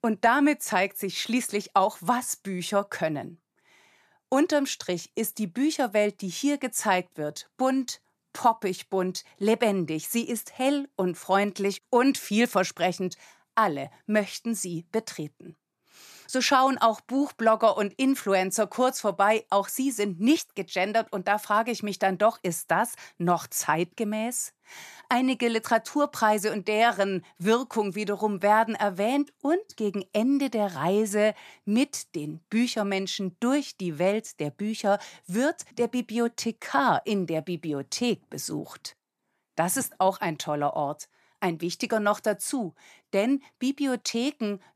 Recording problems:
none

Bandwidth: 14 kHz